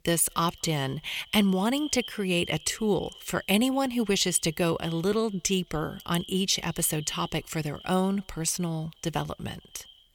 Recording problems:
echo of what is said; faint; throughout; 230 ms later, 20 dB below the speech

